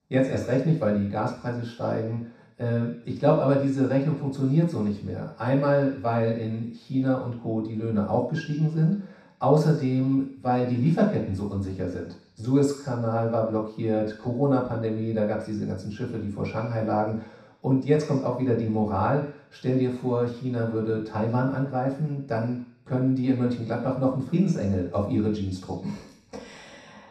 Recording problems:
off-mic speech; far
room echo; noticeable; dies away in 0.7 s

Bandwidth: 13.5 kHz